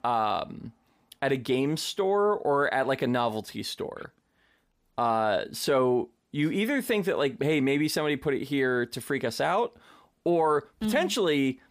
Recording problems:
none

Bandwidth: 15 kHz